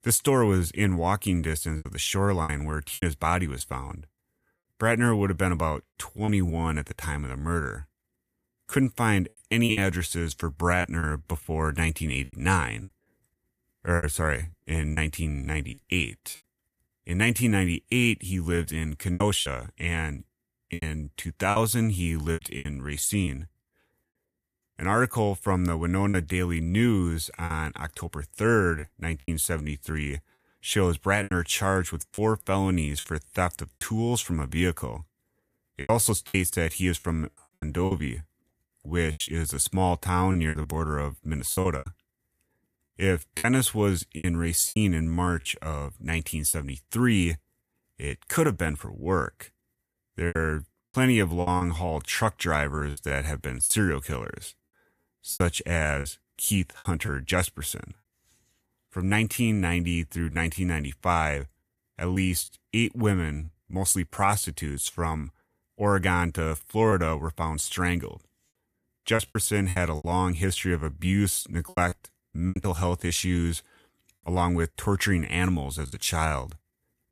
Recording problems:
choppy; very; 7% of the speech affected

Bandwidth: 14.5 kHz